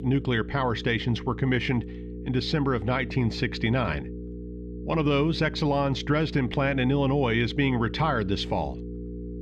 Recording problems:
muffled; very slightly; fading above 3 kHz
electrical hum; noticeable; throughout; 60 Hz, 15 dB below the speech

